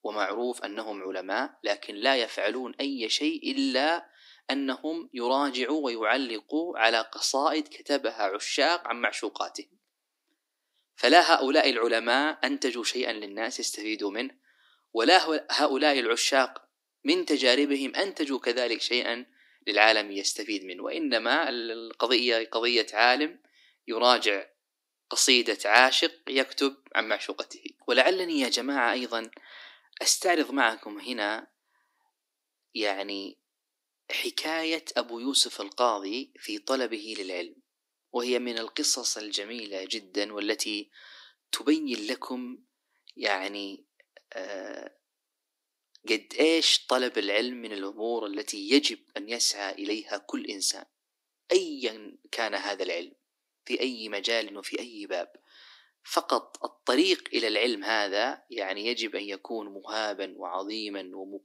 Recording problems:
thin; somewhat; fading below 300 Hz

